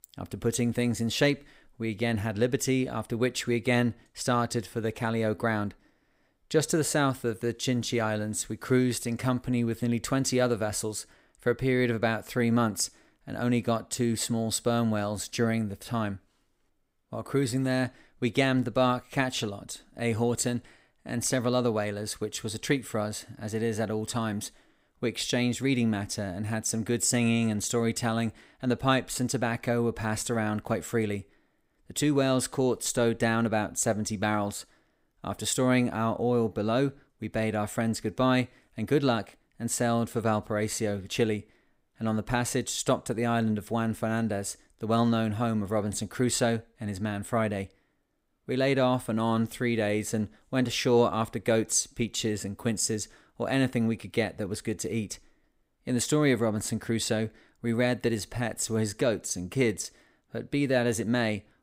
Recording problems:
none

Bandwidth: 15.5 kHz